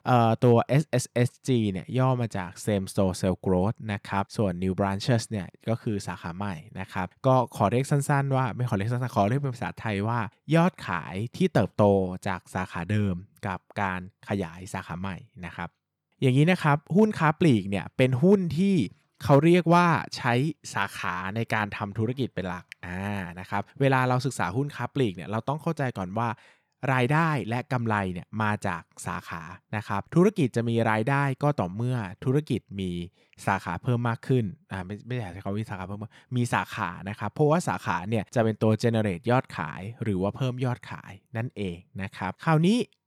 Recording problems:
none

